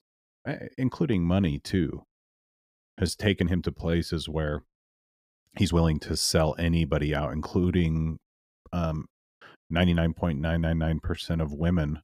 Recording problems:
uneven, jittery; strongly; from 1 to 11 s

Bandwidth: 15 kHz